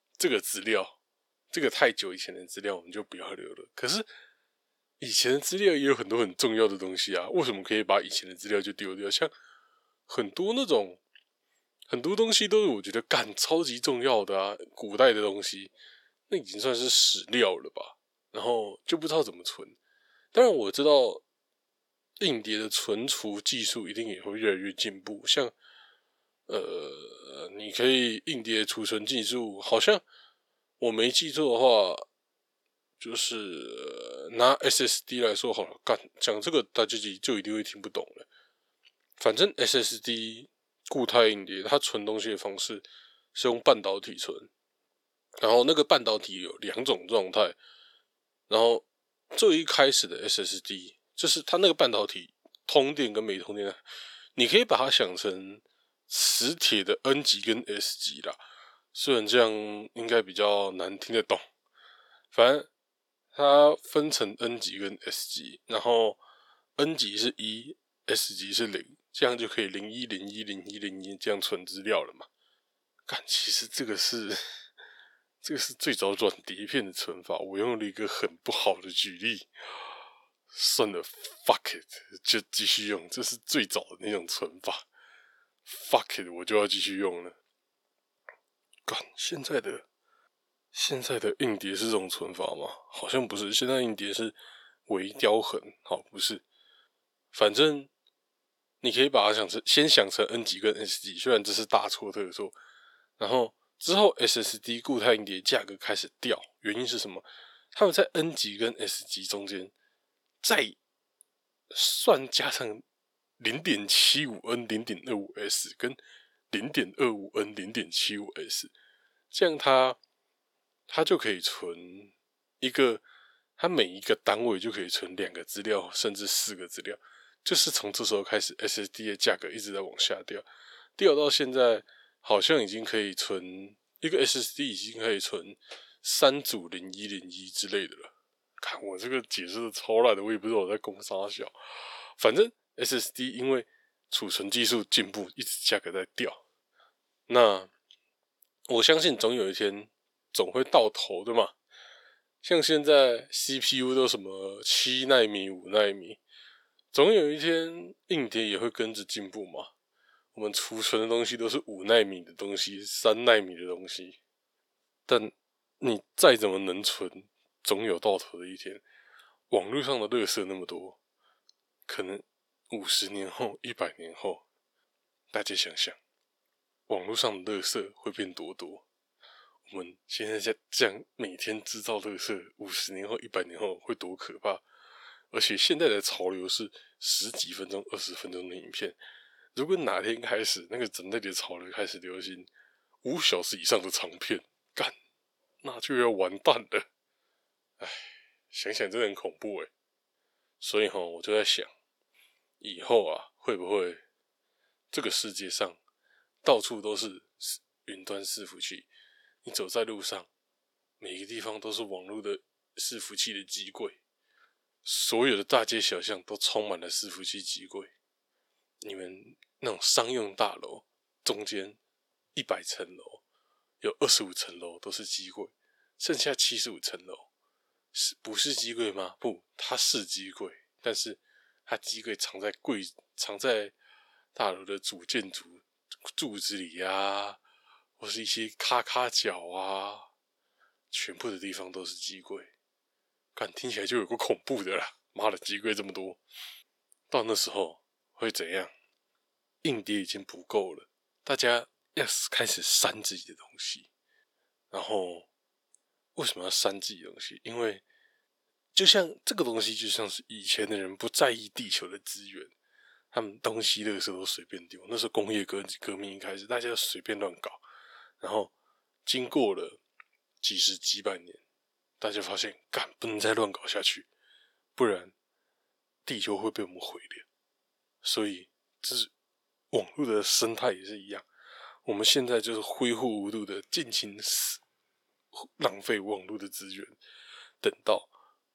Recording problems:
thin; somewhat; fading below 500 Hz

